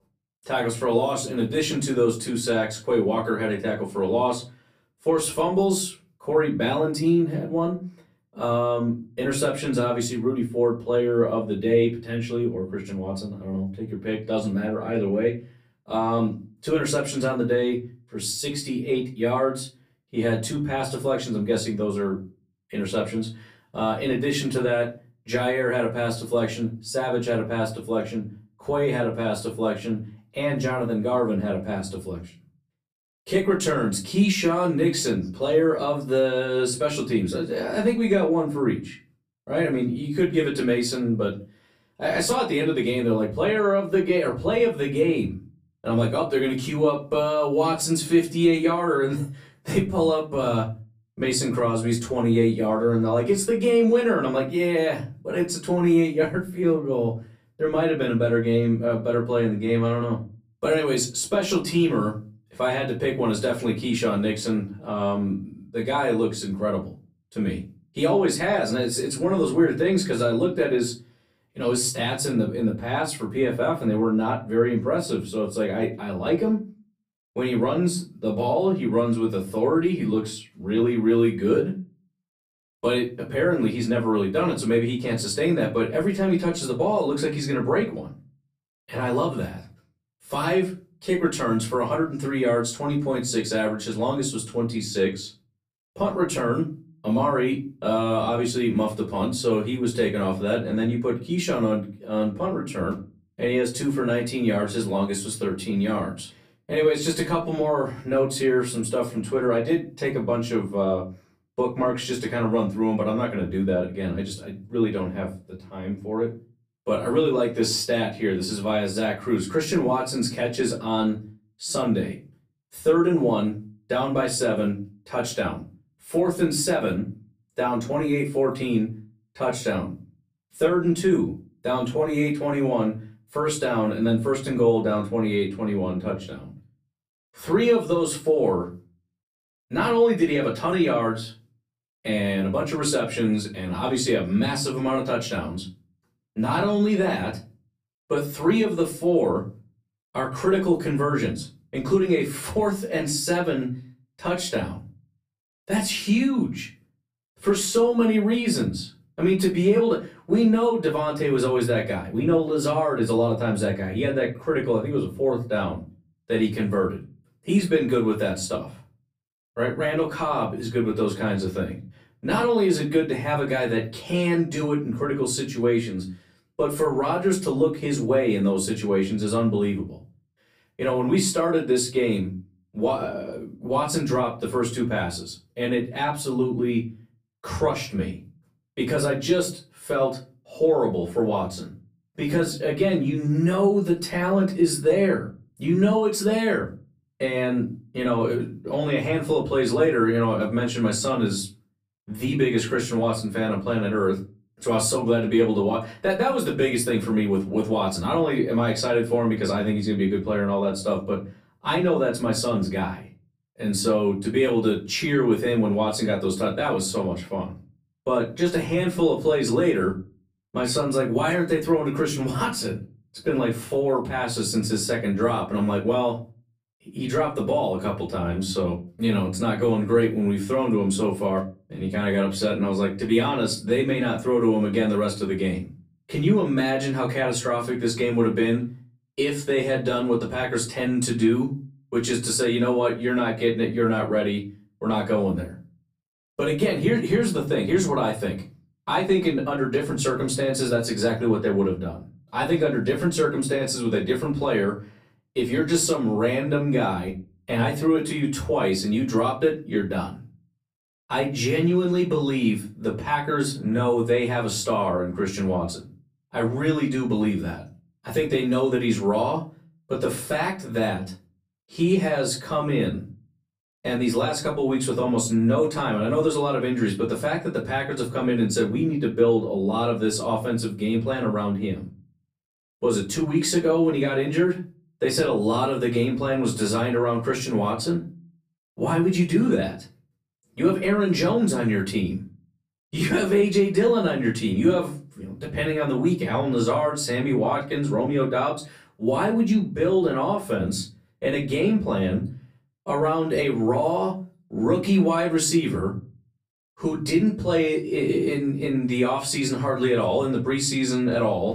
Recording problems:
off-mic speech; far
room echo; very slight; dies away in 0.3 s

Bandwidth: 15 kHz